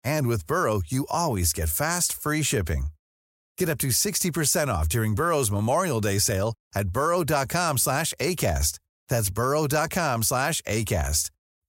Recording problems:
none

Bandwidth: 16 kHz